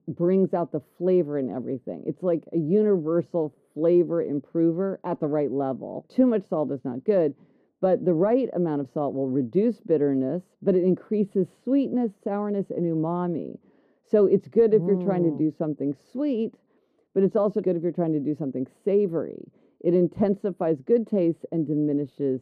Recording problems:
muffled; very; fading above 1 kHz

